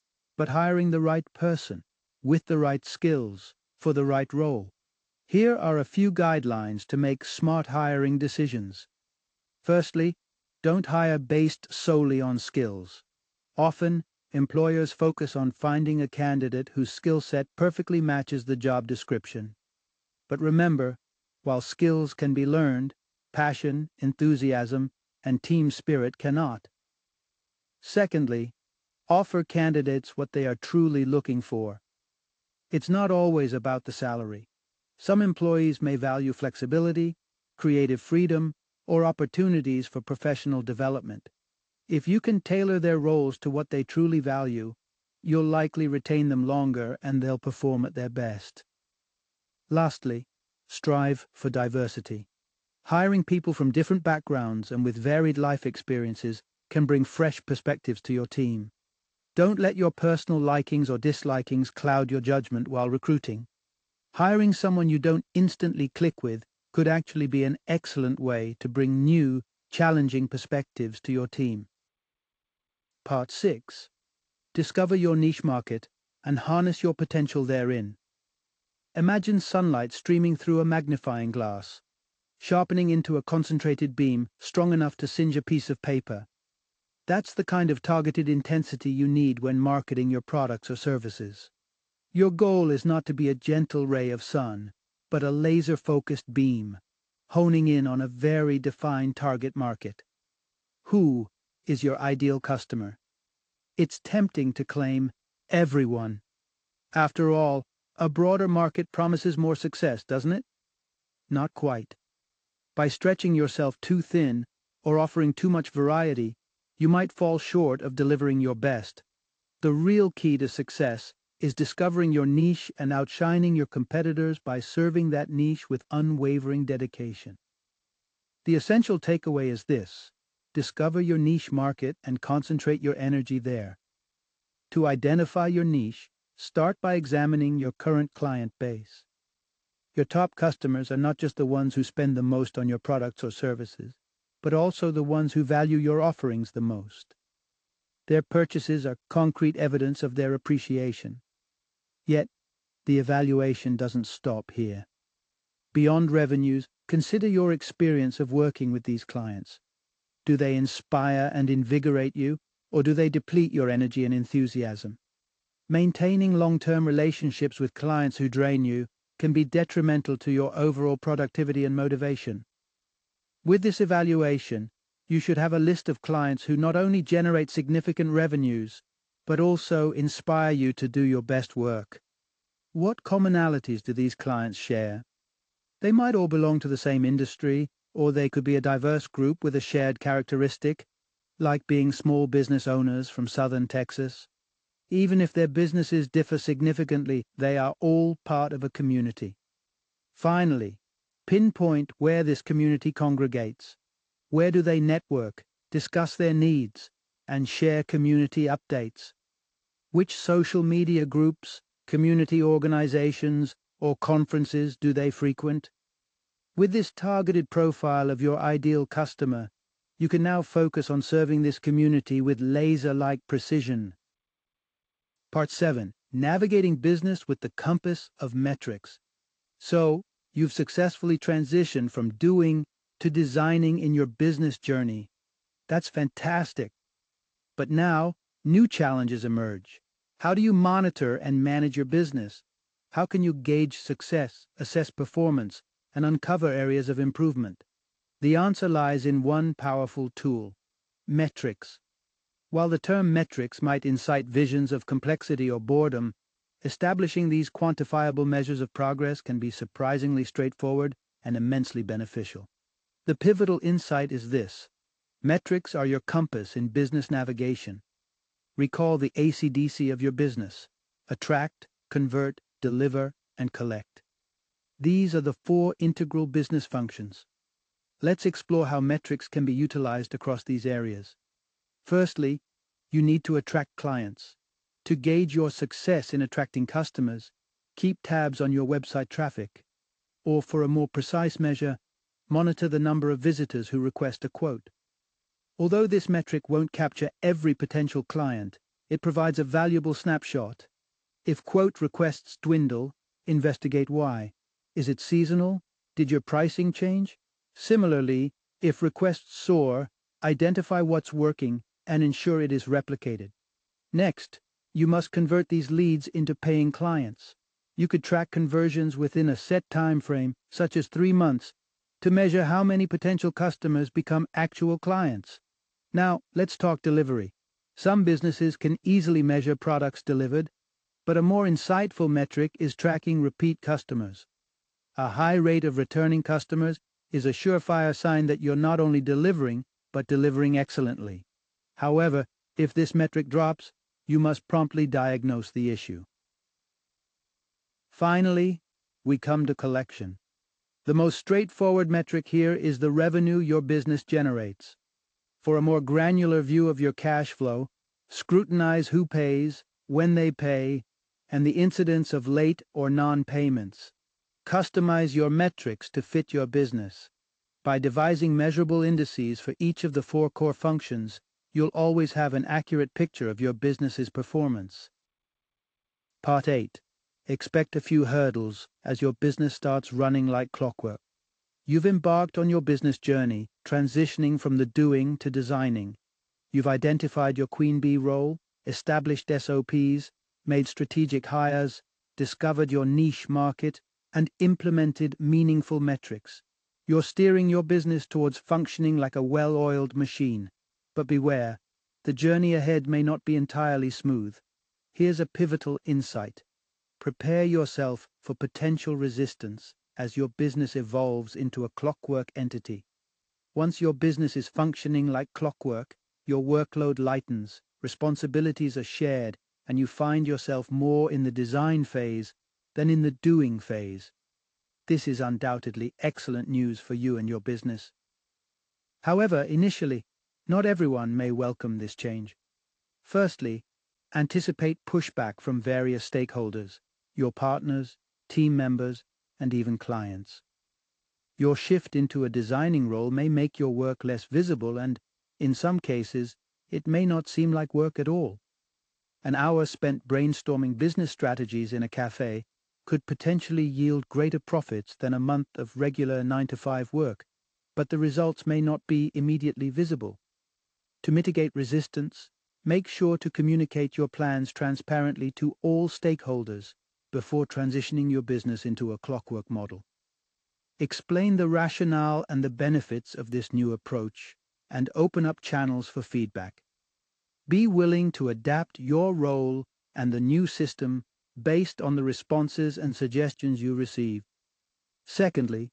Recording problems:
garbled, watery; slightly; nothing above 7.5 kHz

